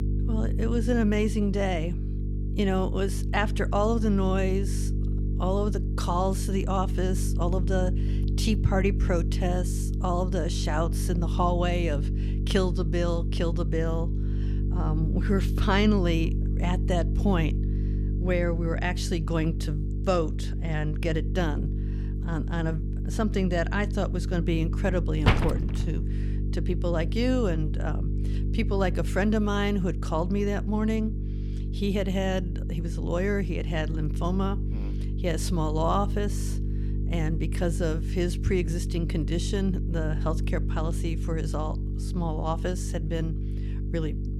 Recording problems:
electrical hum; noticeable; throughout; 50 Hz, 10 dB below the speech
door banging; loud; at 25 s; peak 4 dB above the speech

